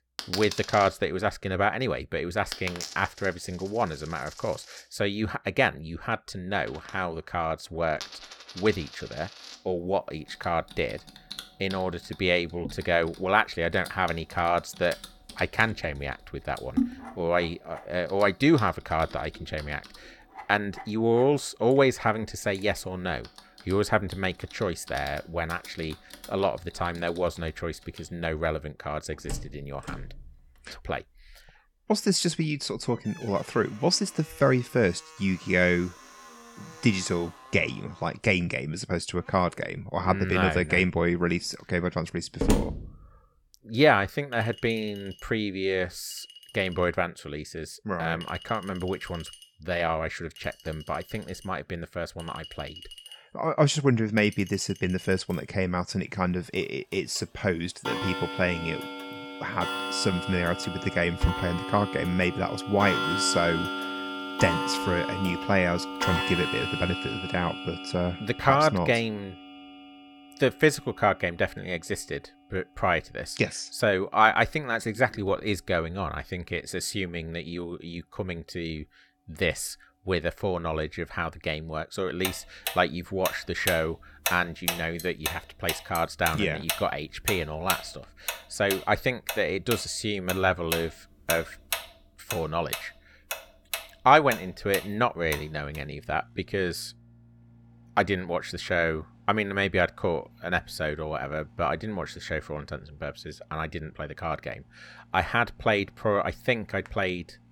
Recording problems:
household noises; loud; throughout; 8 dB below the speech

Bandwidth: 17.5 kHz